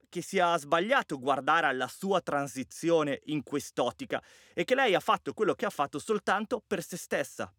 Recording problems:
none

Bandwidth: 17 kHz